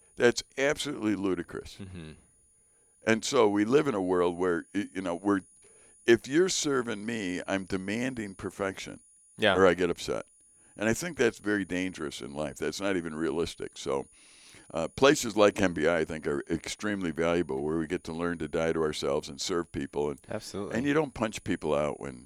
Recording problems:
high-pitched whine; faint; throughout; 9.5 kHz, 30 dB below the speech

